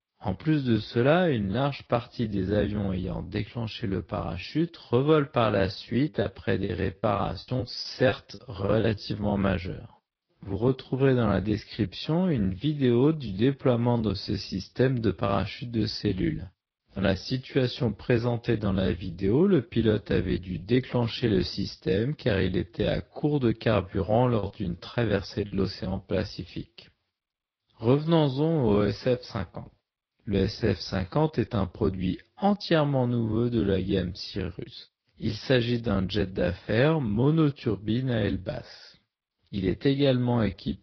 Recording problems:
wrong speed, natural pitch; too slow; 0.7 times normal speed
high frequencies cut off; noticeable; nothing above 5.5 kHz
garbled, watery; slightly
choppy; very; from 6 to 9 s and from 24 to 26 s; 17% of the speech affected

